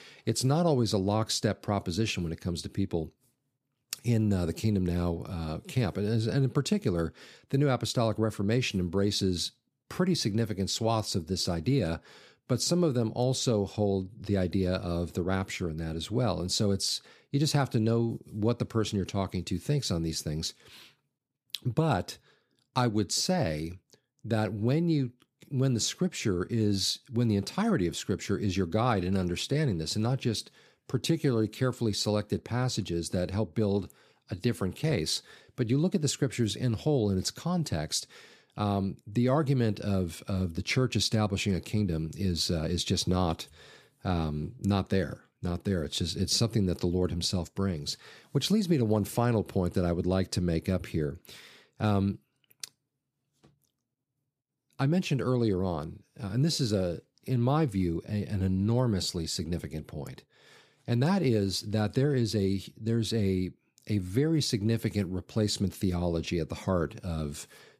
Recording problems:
none

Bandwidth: 15 kHz